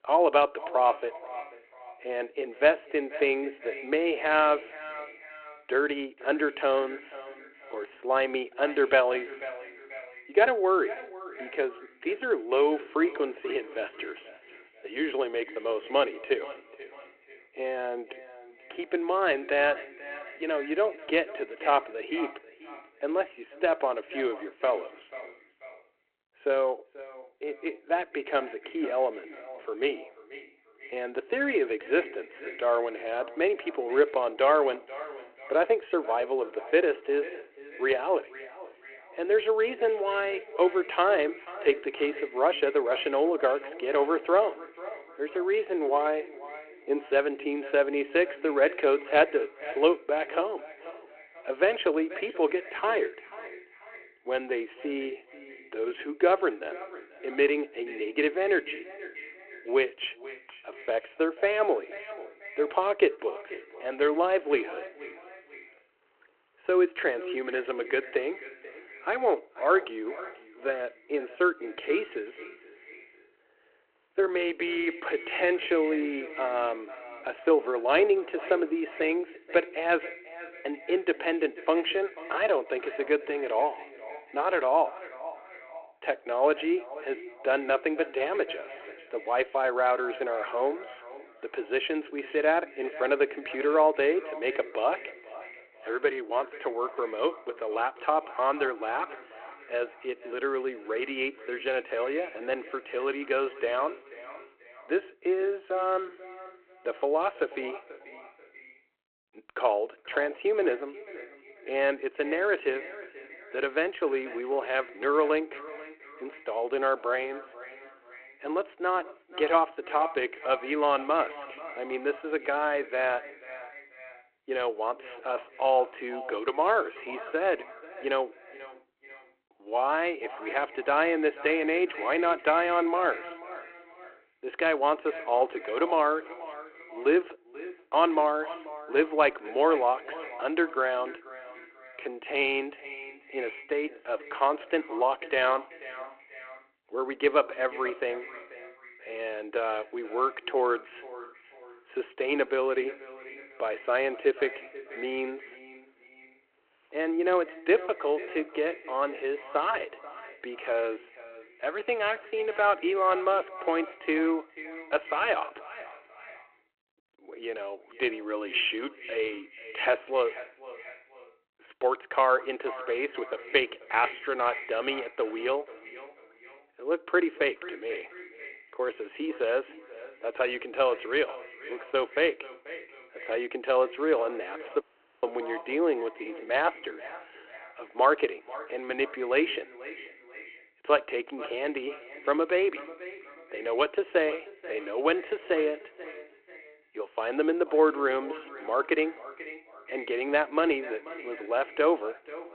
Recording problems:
echo of what is said; noticeable; throughout; 490 ms later, 15 dB below the speech
phone-call audio
audio cutting out; at 3:05

